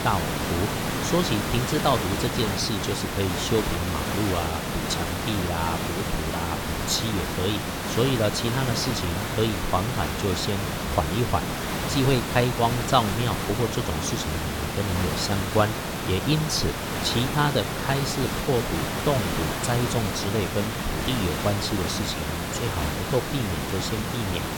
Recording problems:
hiss; loud; throughout; 1 dB below the speech

